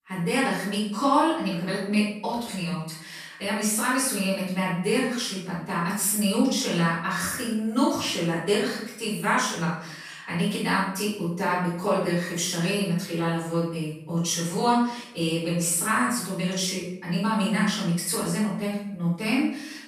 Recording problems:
off-mic speech; far
room echo; noticeable; dies away in 0.6 s

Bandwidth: 14.5 kHz